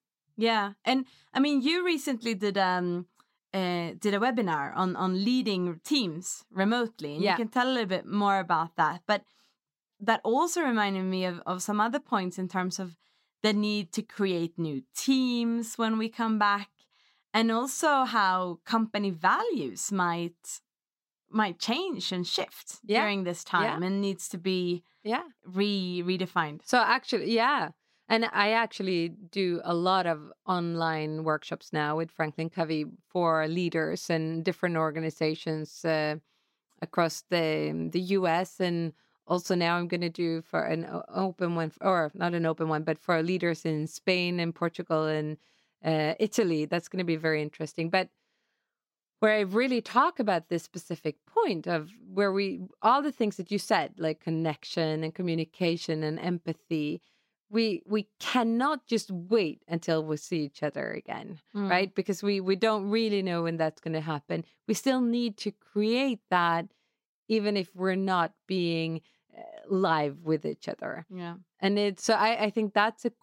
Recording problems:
none

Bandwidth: 16 kHz